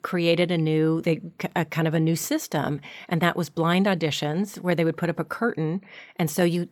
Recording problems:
none

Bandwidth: 18.5 kHz